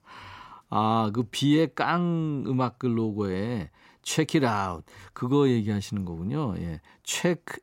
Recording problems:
none

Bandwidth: 16 kHz